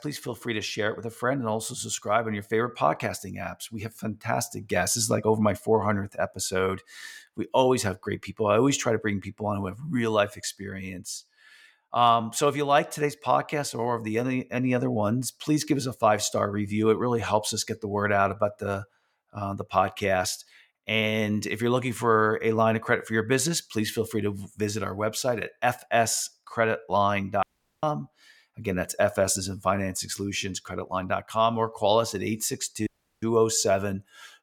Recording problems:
audio cutting out; at 27 s and at 33 s

